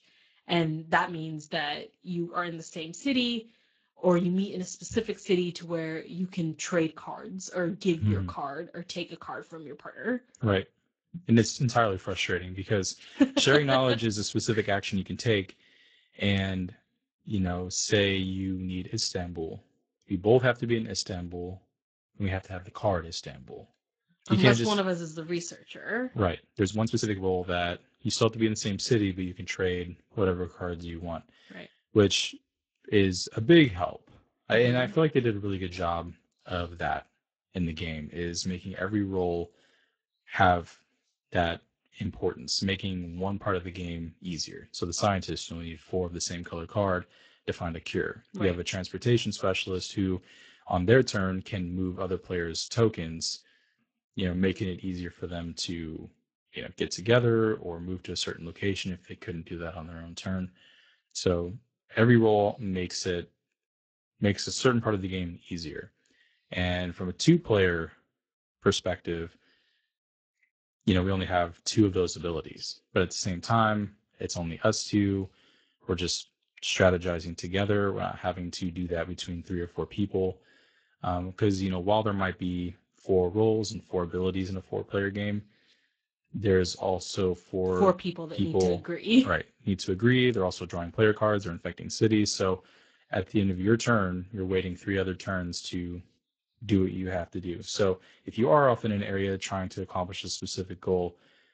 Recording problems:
garbled, watery; slightly; nothing above 7.5 kHz
uneven, jittery; strongly; from 10 s to 1:37

